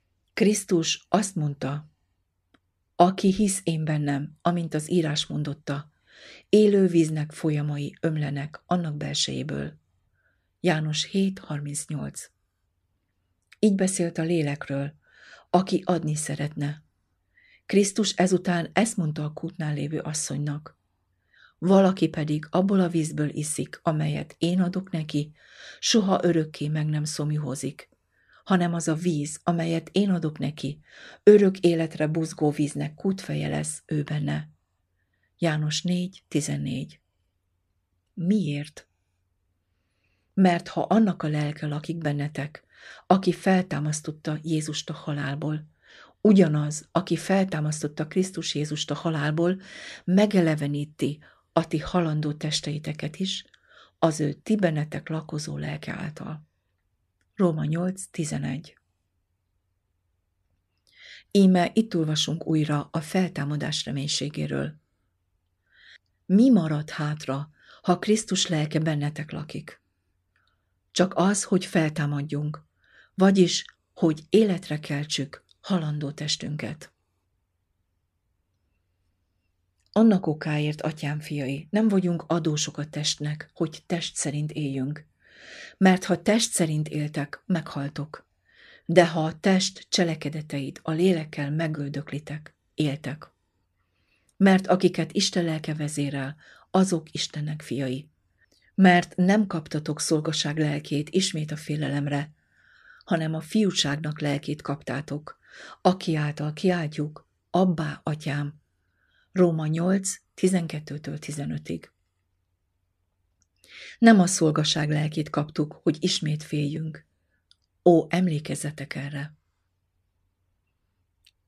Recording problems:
none

